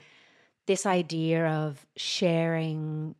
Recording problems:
none

